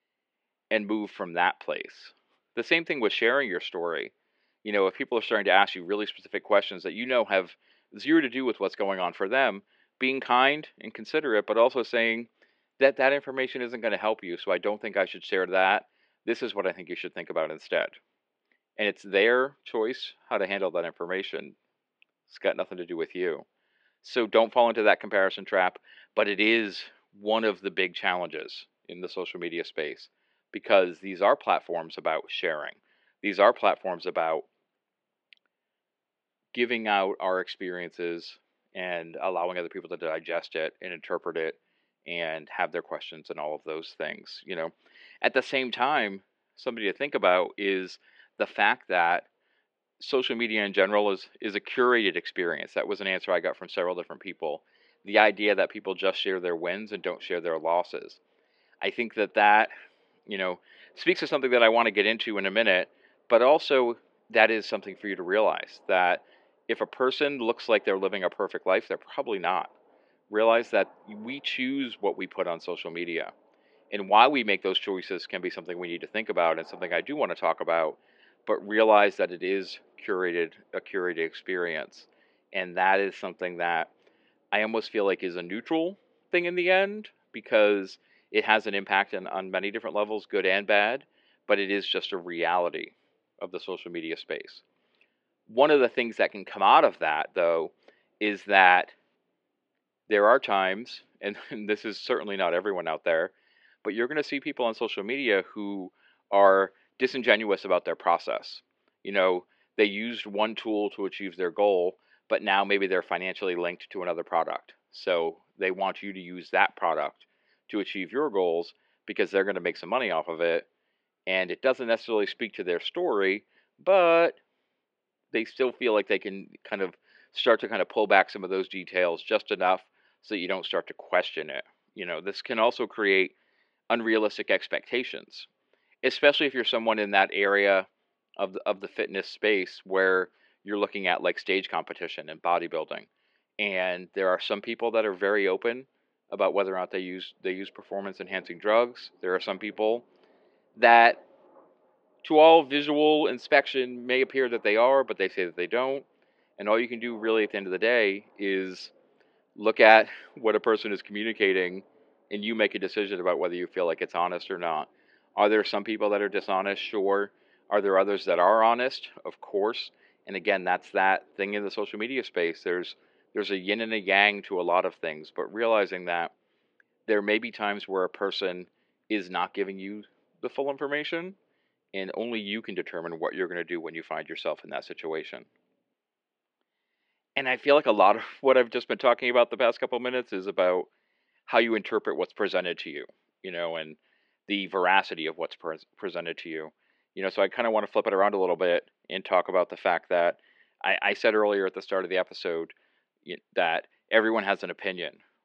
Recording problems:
muffled; slightly; fading above 3 kHz
thin; very slightly; fading below 350 Hz

